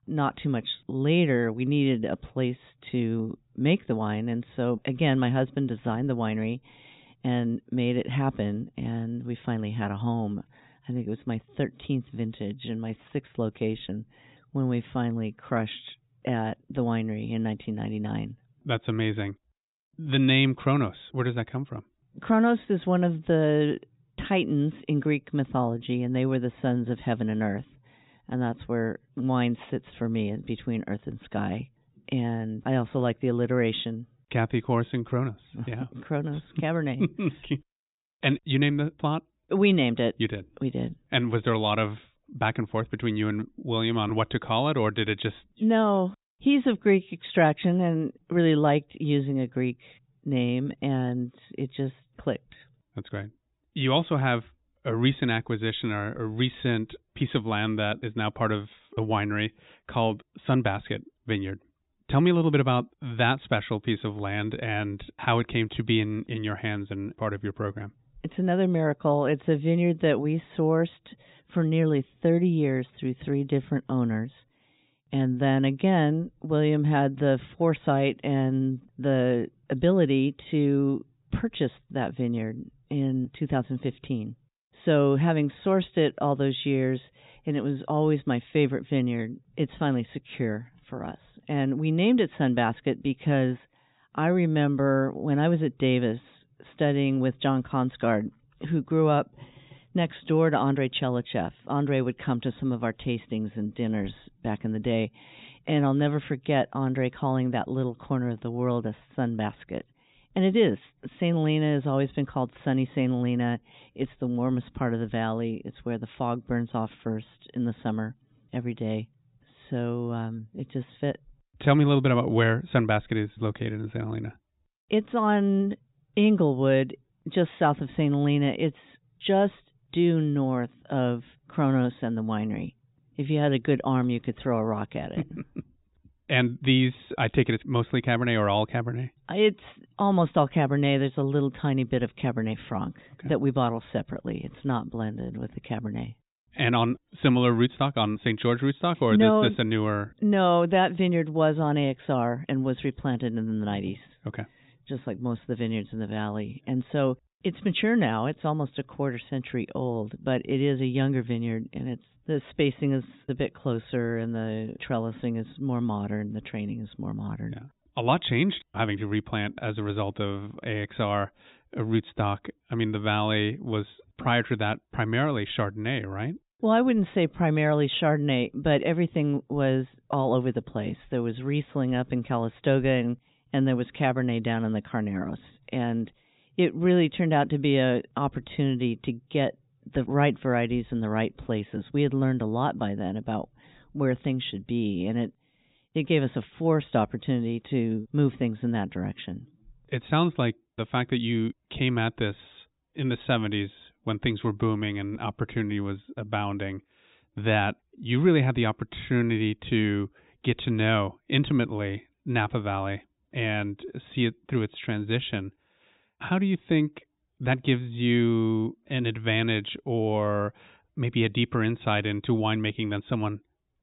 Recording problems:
high frequencies cut off; severe; nothing above 4 kHz

